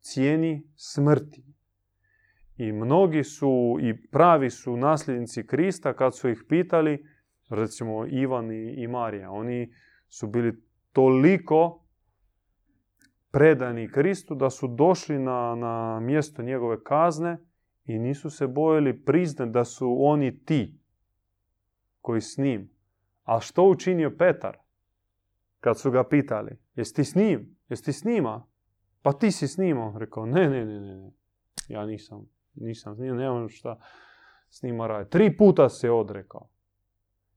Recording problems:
none

